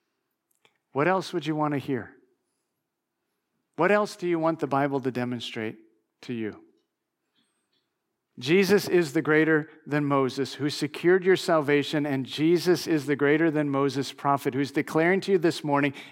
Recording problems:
none

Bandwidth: 16 kHz